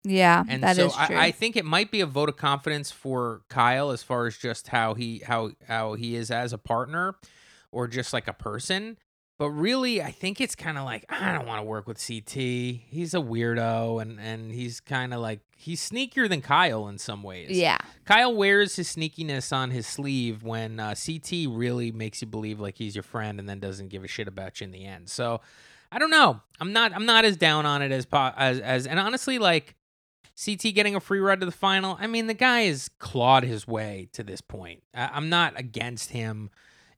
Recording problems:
none

